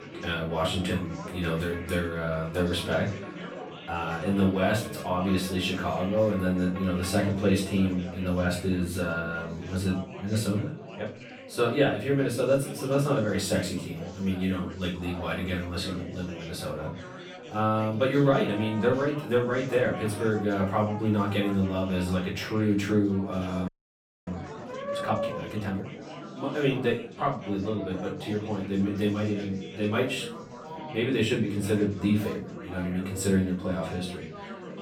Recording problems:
off-mic speech; far
room echo; slight; dies away in 0.4 s
background music; noticeable; throughout; 15 dB below the speech
chatter from many people; noticeable; throughout; 15 dB below the speech
audio freezing; at 24 s for 0.5 s

